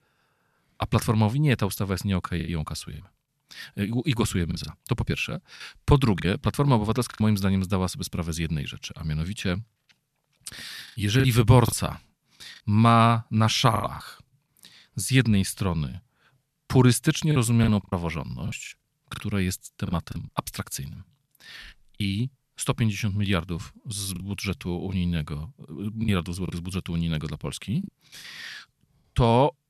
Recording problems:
choppy; very; 5% of the speech affected

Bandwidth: 13.5 kHz